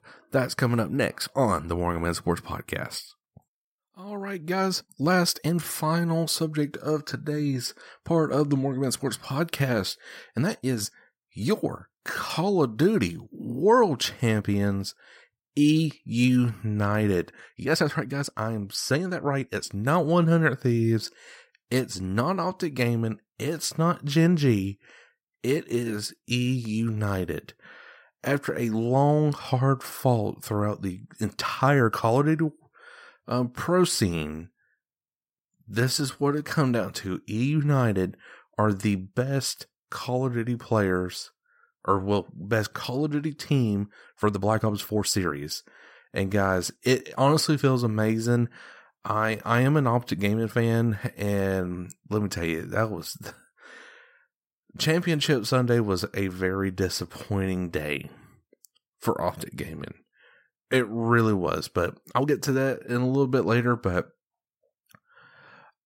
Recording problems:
uneven, jittery; strongly; from 4 s to 1:03

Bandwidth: 16 kHz